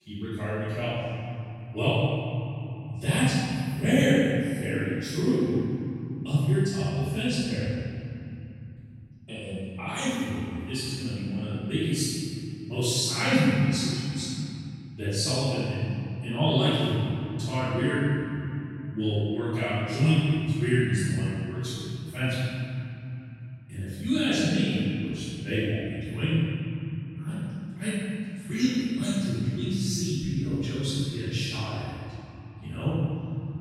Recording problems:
room echo; strong; dies away in 3 s
off-mic speech; far

